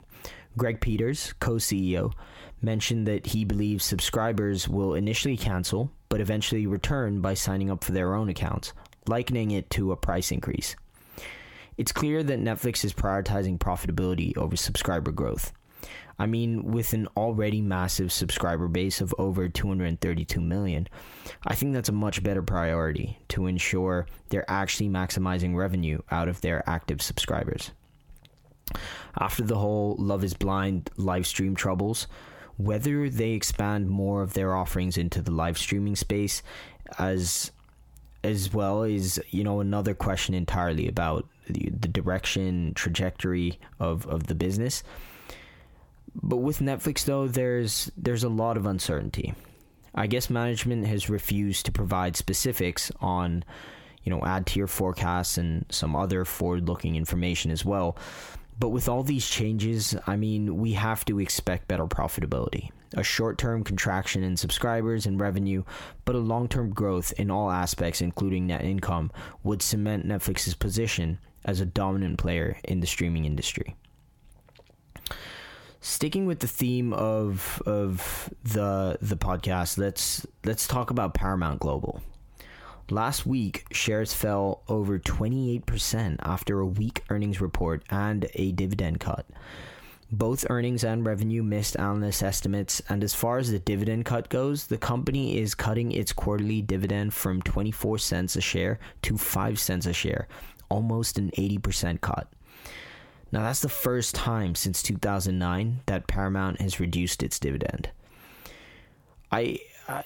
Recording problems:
squashed, flat; heavily

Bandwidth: 17 kHz